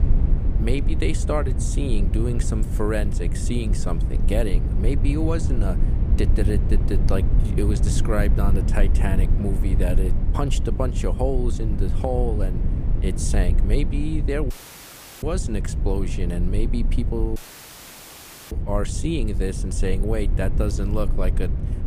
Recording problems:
low rumble; loud; throughout; 8 dB below the speech
audio cutting out; filled with static; at 15 s for 0.5 s and at 17 s for 1 s

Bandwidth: 15 kHz